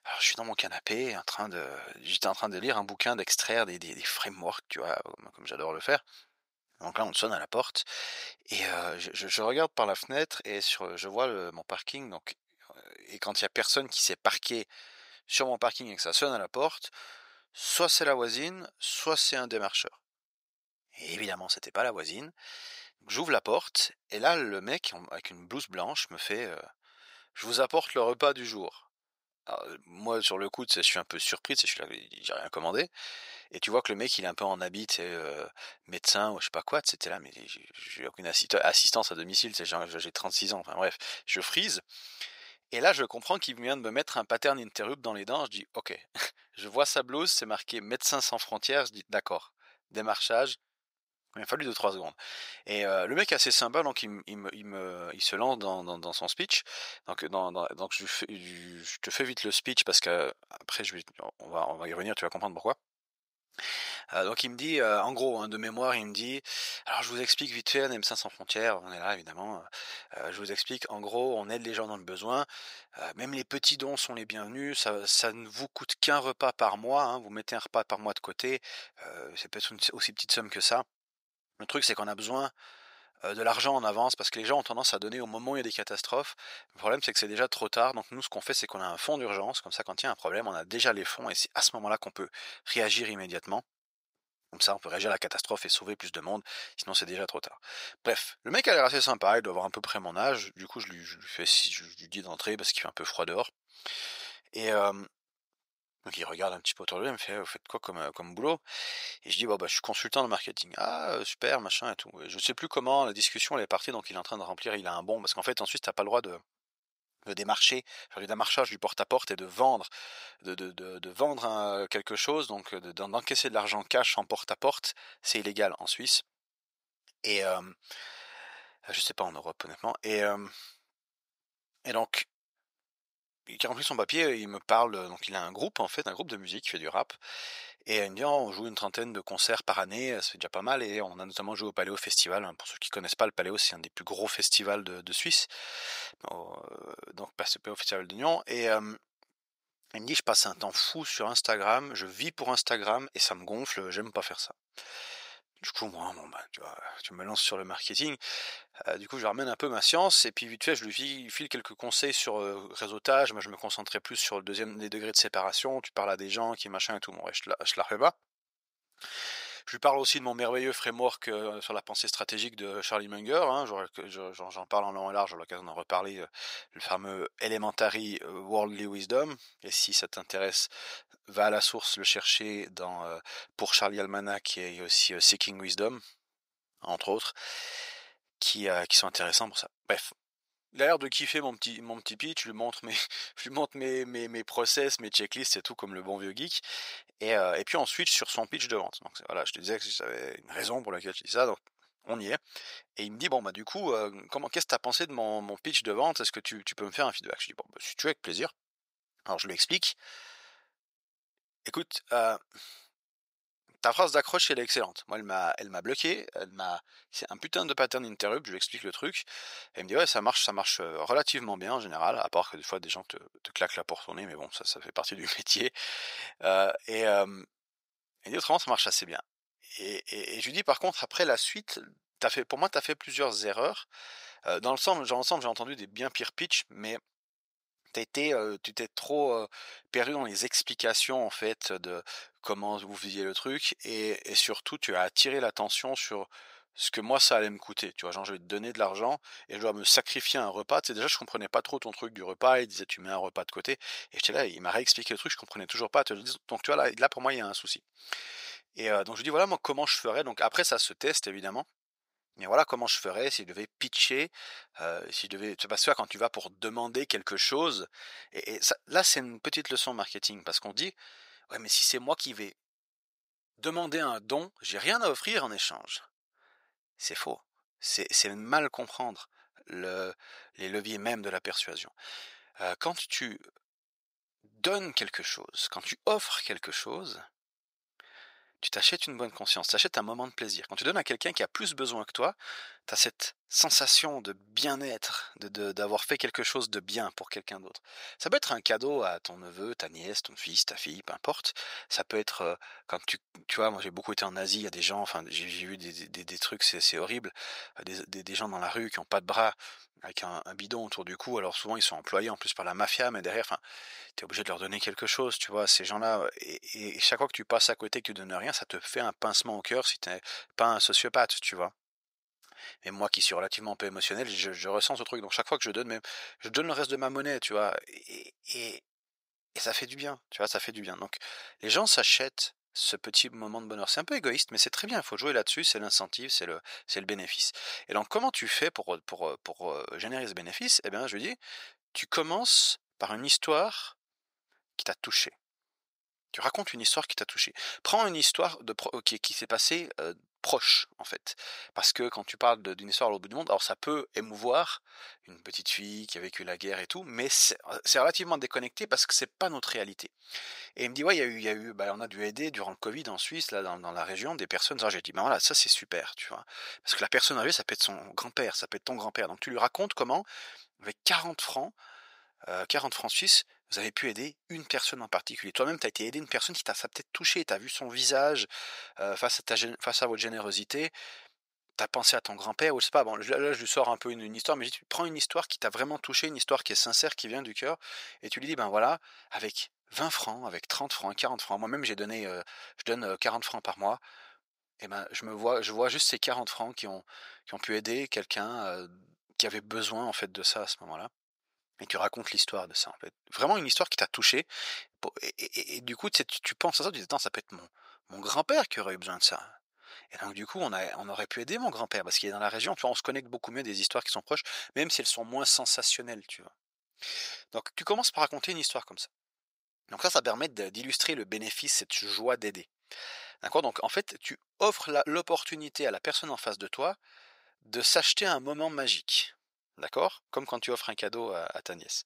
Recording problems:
thin; very; fading below 700 Hz

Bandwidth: 15.5 kHz